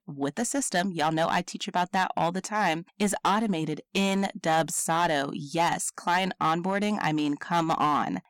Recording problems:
distortion; slight; 6% of the sound clipped

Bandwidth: 17.5 kHz